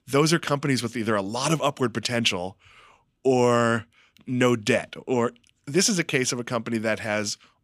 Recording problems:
none

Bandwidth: 15 kHz